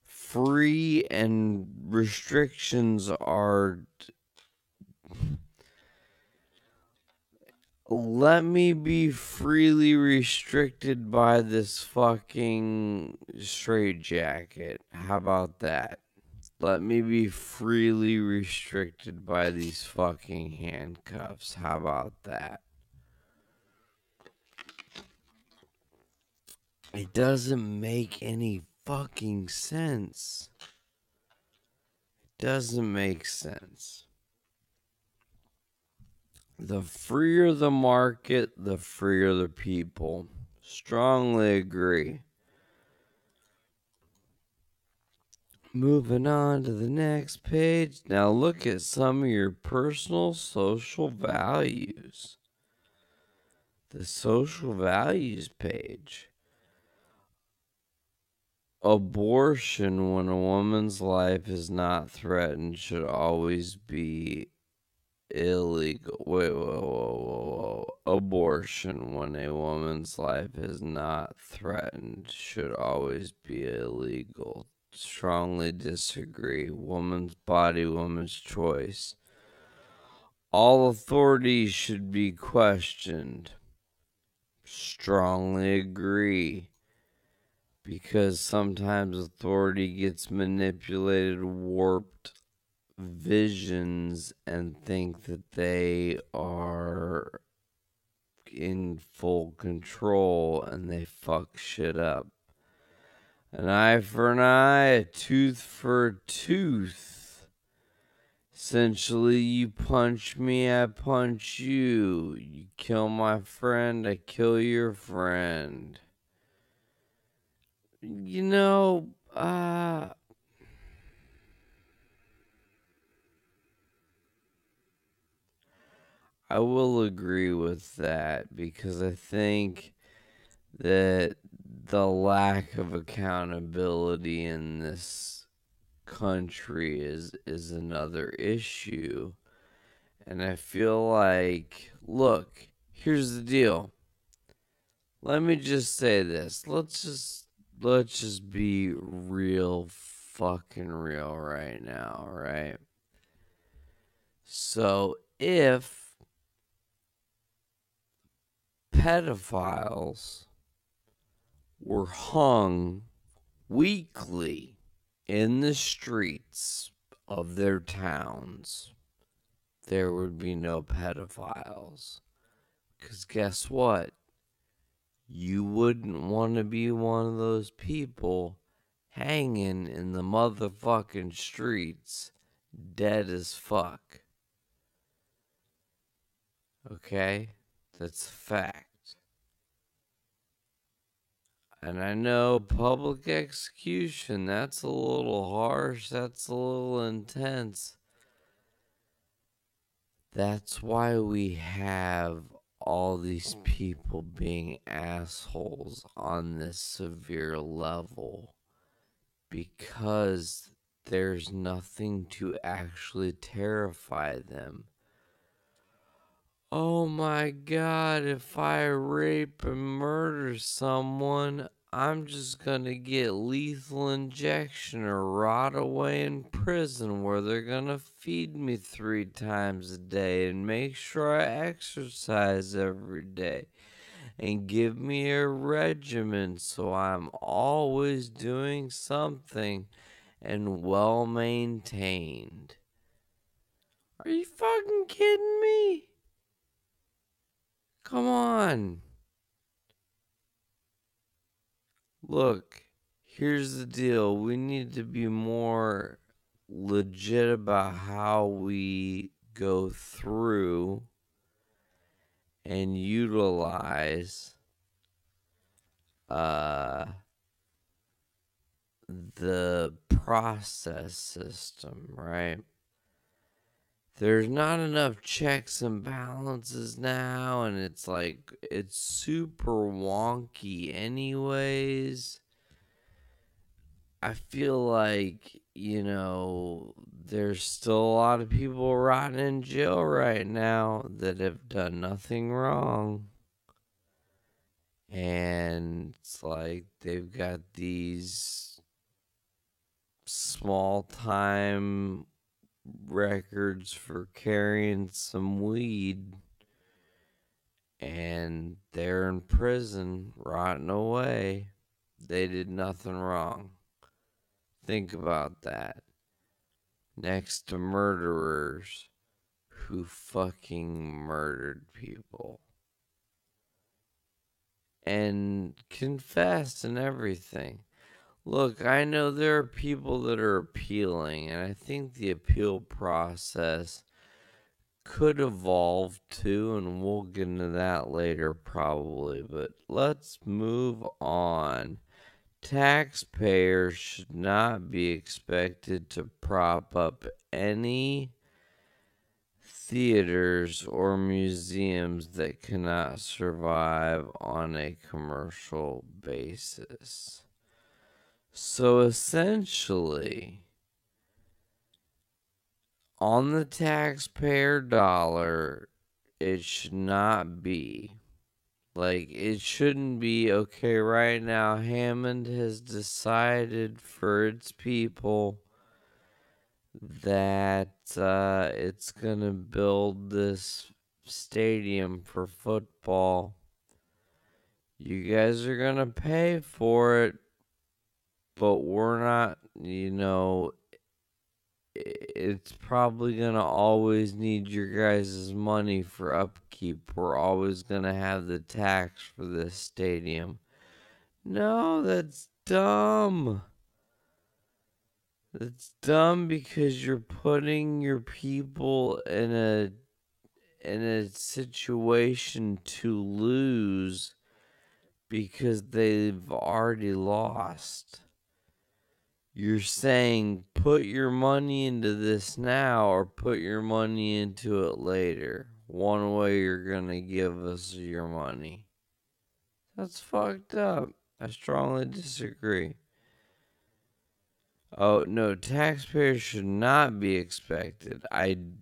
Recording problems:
wrong speed, natural pitch; too slow; 0.5 times normal speed

